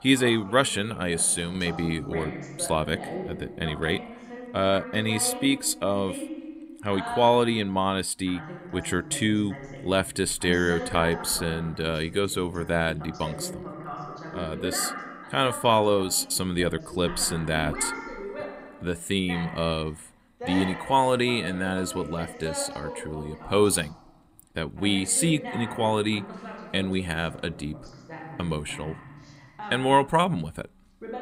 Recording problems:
voice in the background; noticeable; throughout; 10 dB below the speech

